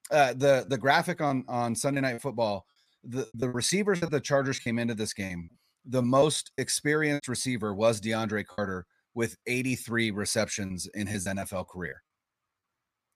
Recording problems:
choppy; very; 8% of the speech affected

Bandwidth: 14.5 kHz